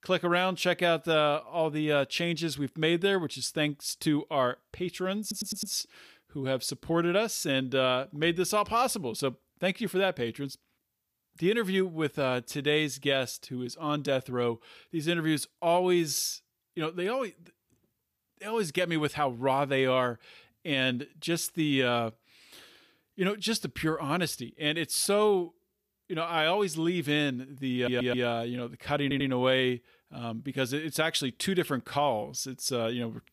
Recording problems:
audio stuttering; at 5 s, at 28 s and at 29 s

